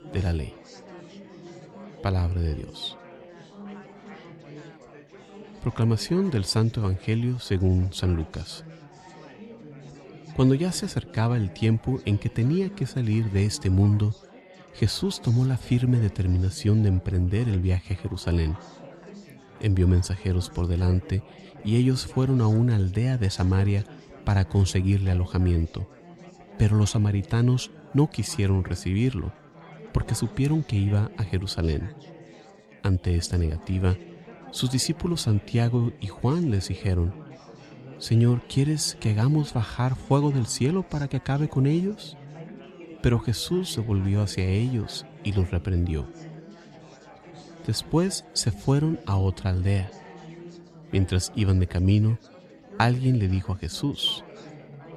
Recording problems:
chatter from many people; noticeable; throughout; 20 dB below the speech

